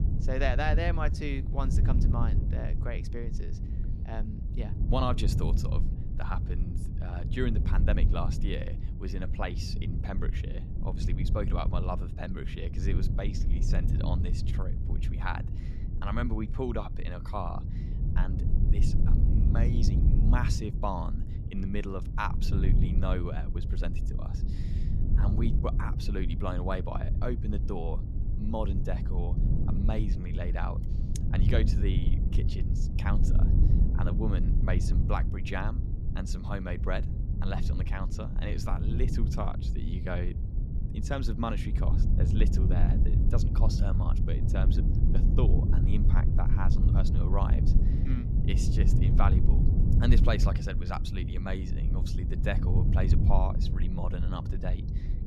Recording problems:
low rumble; loud; throughout; 5 dB below the speech

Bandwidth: 14.5 kHz